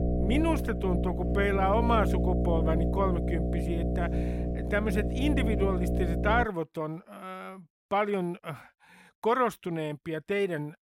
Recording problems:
electrical hum; loud; until 6.5 s; 60 Hz, 6 dB below the speech

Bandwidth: 16 kHz